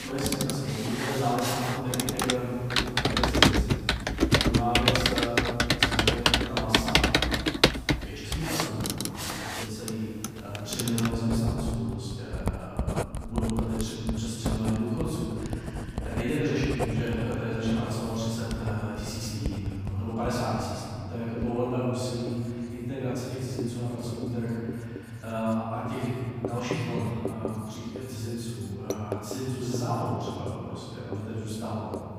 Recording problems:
room echo; strong; dies away in 2.4 s
off-mic speech; far
household noises; very loud; throughout; 3 dB above the speech

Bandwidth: 15 kHz